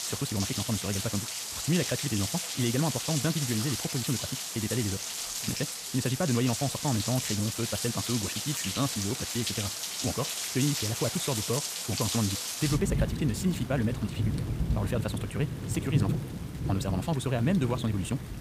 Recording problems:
wrong speed, natural pitch; too fast; 1.7 times normal speed
rain or running water; loud; throughout; 1 dB below the speech

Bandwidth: 15 kHz